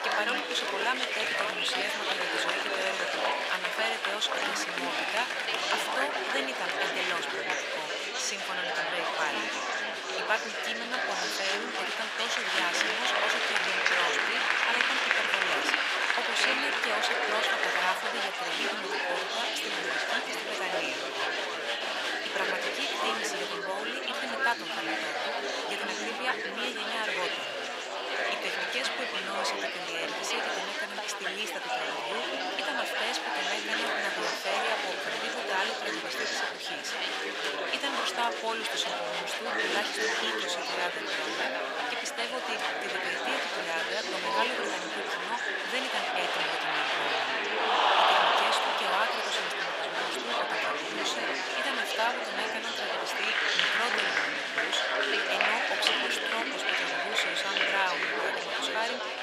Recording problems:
thin; very; fading below 700 Hz
murmuring crowd; very loud; throughout; 6 dB above the speech

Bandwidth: 15.5 kHz